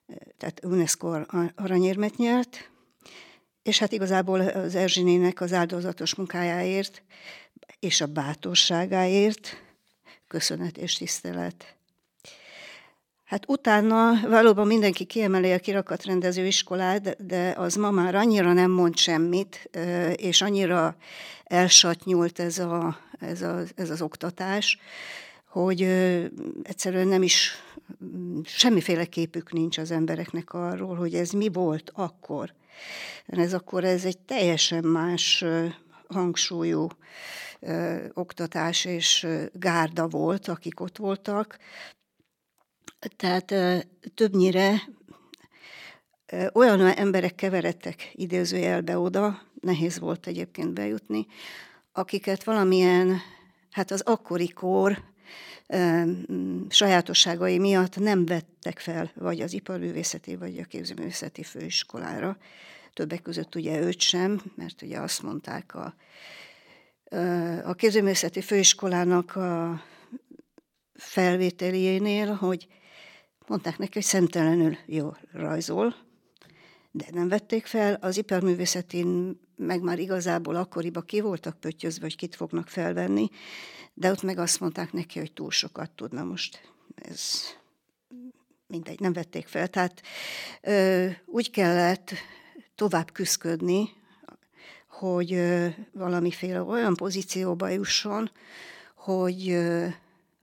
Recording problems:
uneven, jittery; strongly; from 4 s to 1:40

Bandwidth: 17 kHz